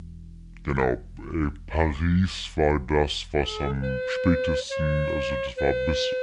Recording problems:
wrong speed and pitch; too slow and too low; 0.7 times normal speed
background music; loud; throughout; 2 dB below the speech

